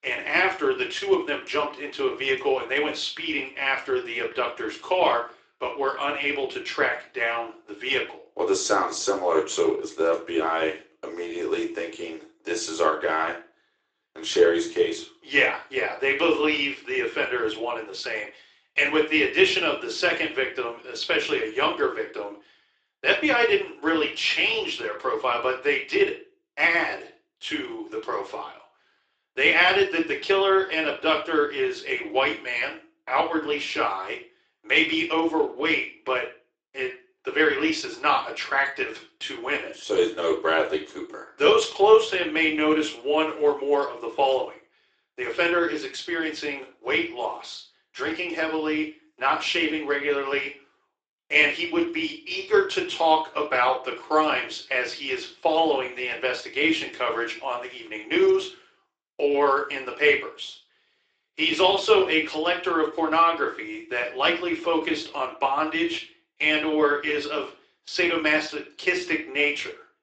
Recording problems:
thin; very; fading below 300 Hz
room echo; slight; dies away in 0.3 s
off-mic speech; somewhat distant
garbled, watery; slightly; nothing above 8 kHz

